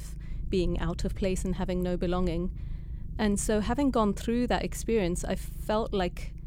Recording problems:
low rumble; faint; throughout; 25 dB below the speech

